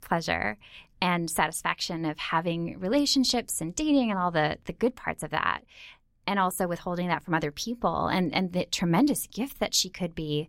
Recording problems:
none

